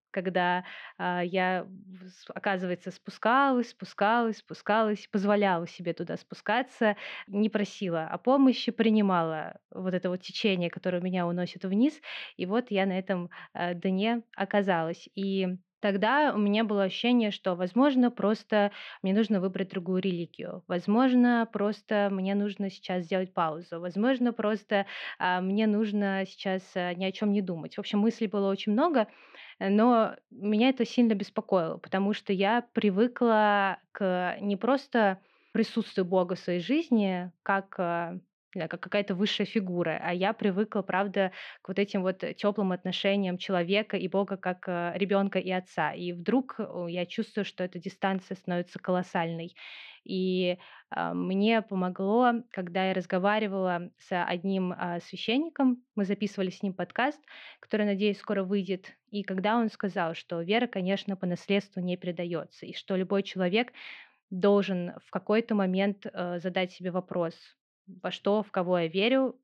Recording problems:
muffled; slightly; fading above 3 kHz

